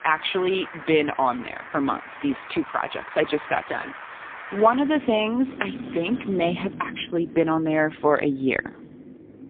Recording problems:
phone-call audio; poor line
traffic noise; noticeable; throughout; 15 dB below the speech

